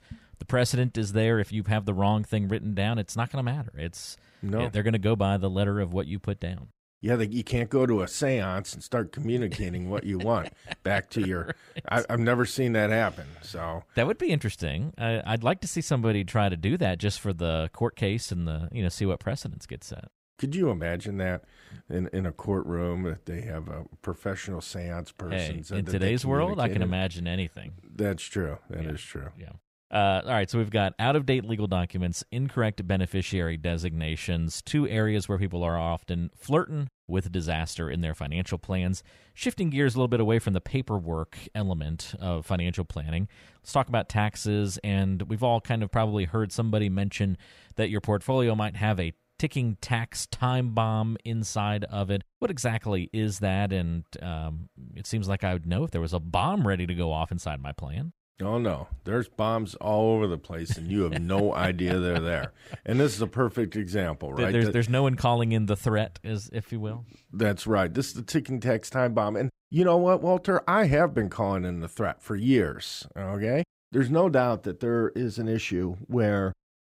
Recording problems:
none

